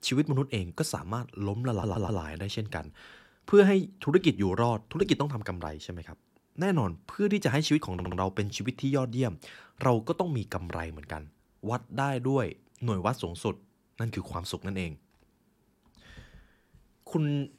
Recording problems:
audio stuttering; at 1.5 s and at 8 s

